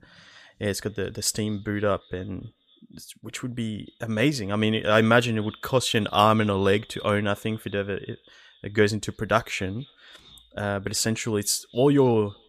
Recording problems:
echo of what is said; faint; throughout; 260 ms later, 25 dB below the speech

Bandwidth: 15 kHz